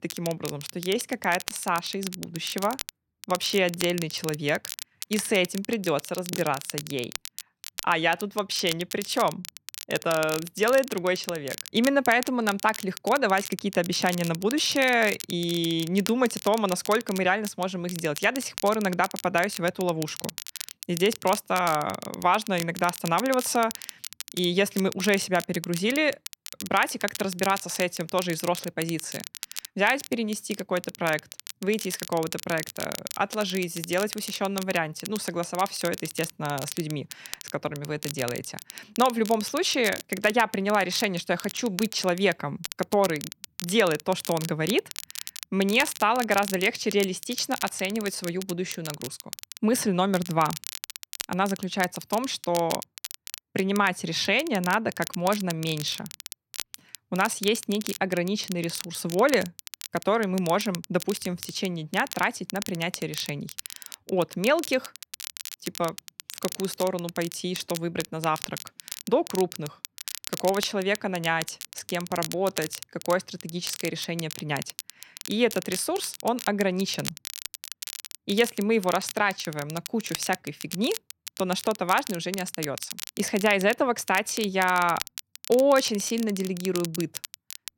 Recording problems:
crackle, like an old record; noticeable; 10 dB below the speech

